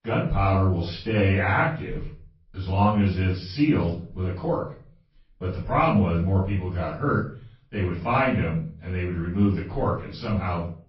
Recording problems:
off-mic speech; far
room echo; noticeable; dies away in 0.4 s
garbled, watery; slightly; nothing above 5.5 kHz
high frequencies cut off; slight

